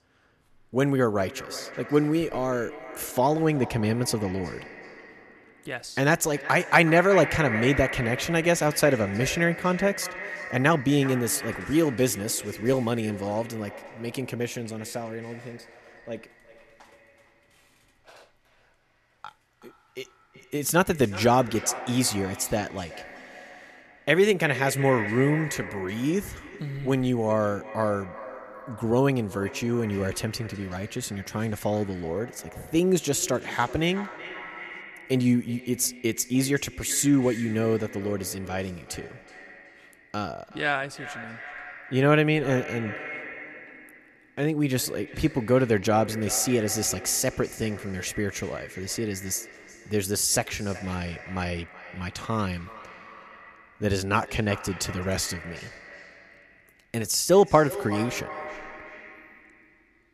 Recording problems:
echo of what is said; noticeable; throughout; 370 ms later, 15 dB below the speech

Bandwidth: 13.5 kHz